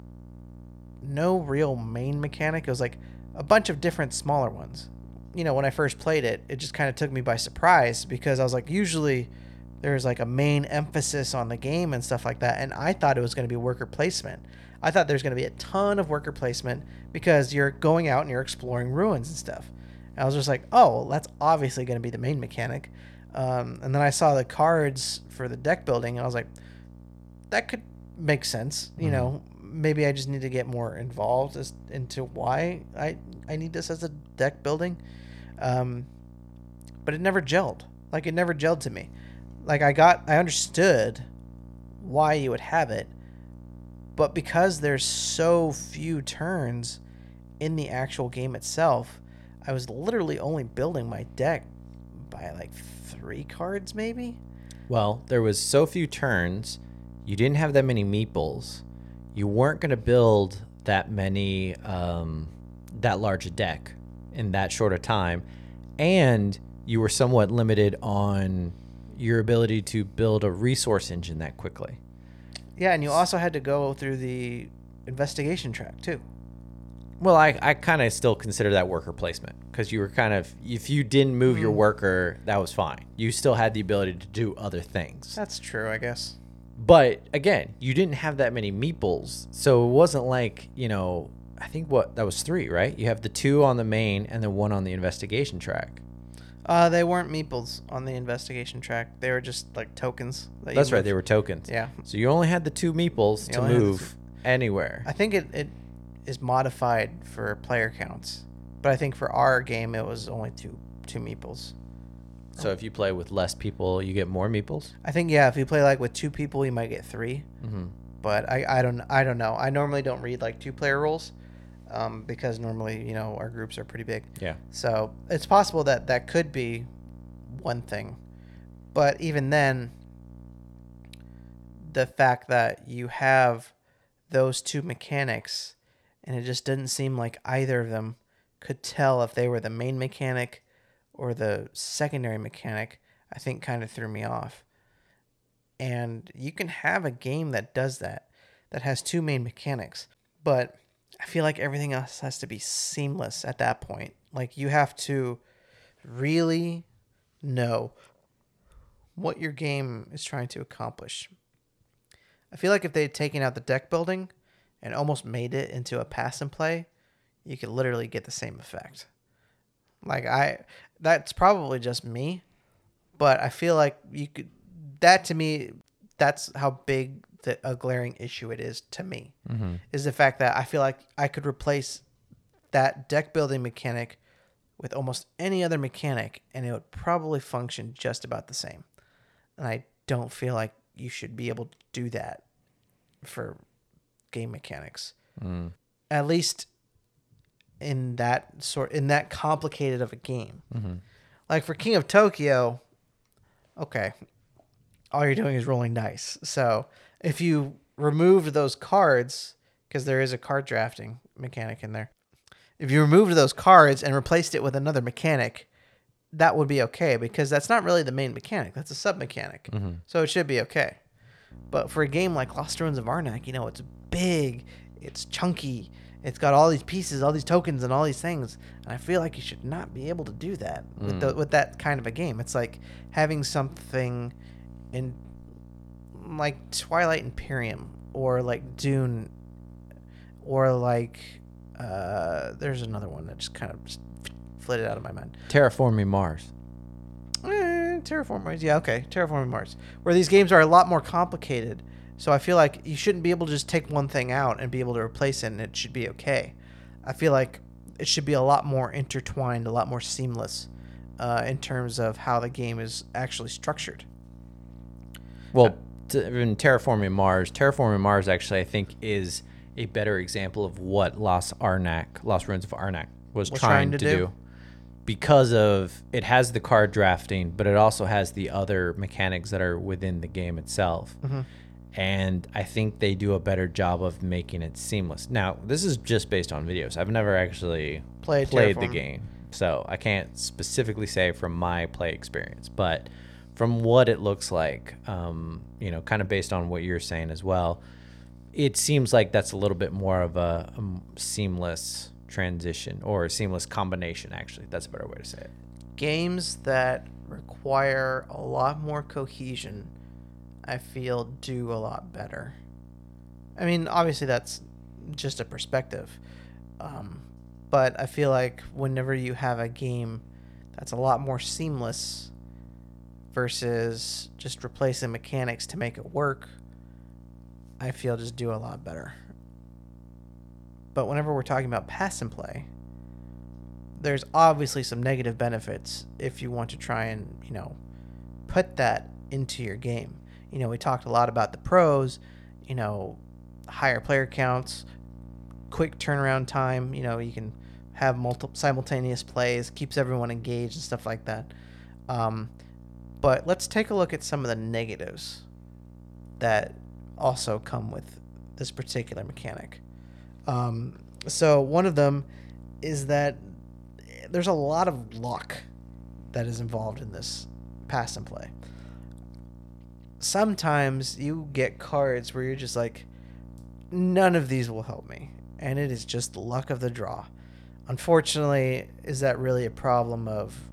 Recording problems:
electrical hum; faint; until 2:12 and from 3:42 on; 60 Hz, 30 dB below the speech

